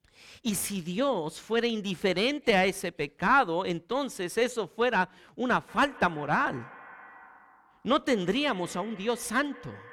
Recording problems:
echo of what is said; faint; from 5.5 s on; 160 ms later, 20 dB below the speech

